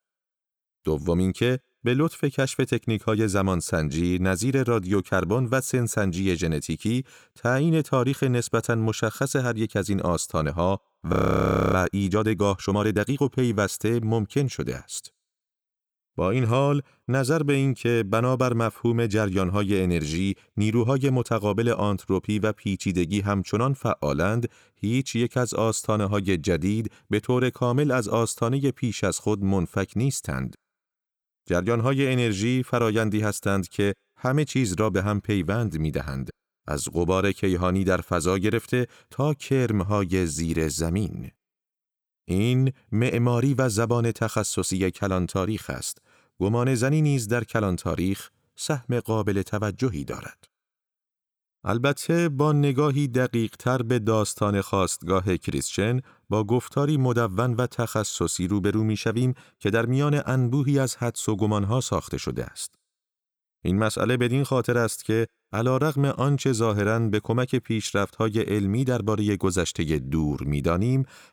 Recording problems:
audio freezing; at 11 s for 0.5 s

